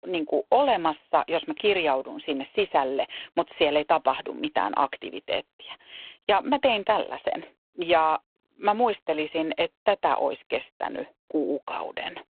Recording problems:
phone-call audio; poor line

